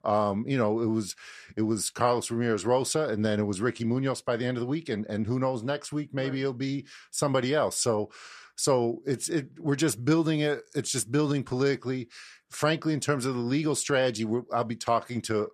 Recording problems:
none

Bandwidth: 14.5 kHz